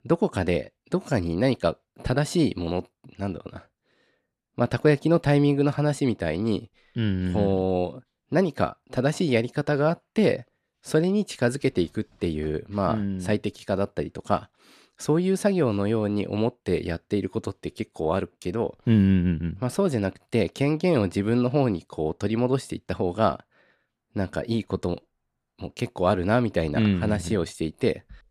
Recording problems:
none

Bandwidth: 14 kHz